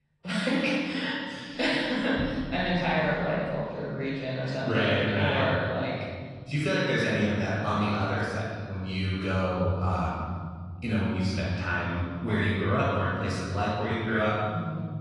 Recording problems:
room echo; strong; dies away in 2.4 s
off-mic speech; far
garbled, watery; slightly; nothing above 10.5 kHz

